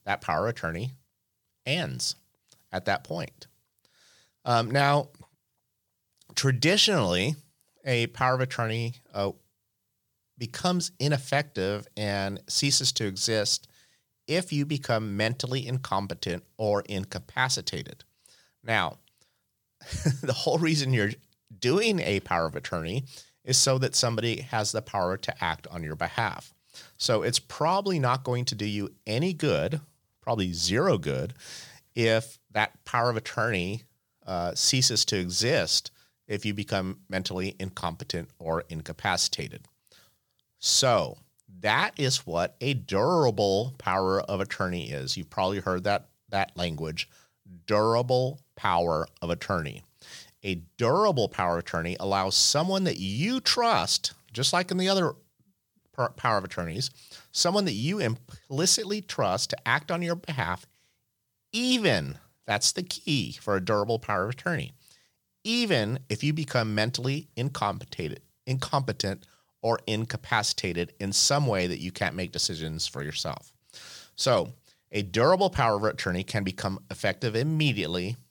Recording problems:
none

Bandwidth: 18.5 kHz